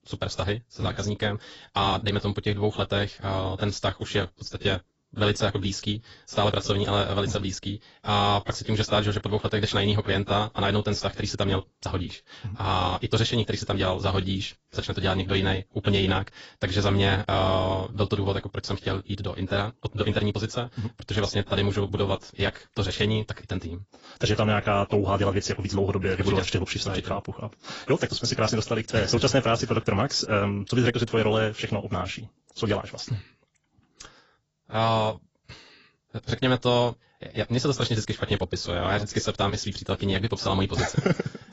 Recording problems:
garbled, watery; badly; nothing above 7.5 kHz
wrong speed, natural pitch; too fast; 1.7 times normal speed

